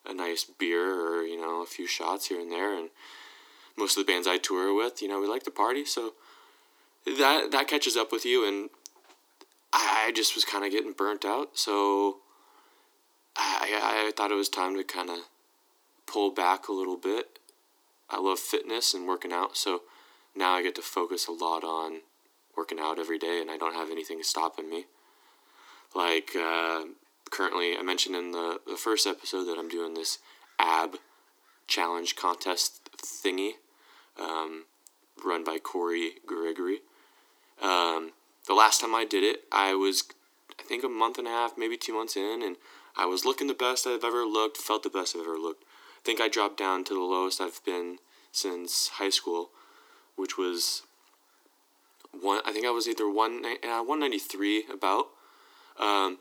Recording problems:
thin; very; fading below 300 Hz

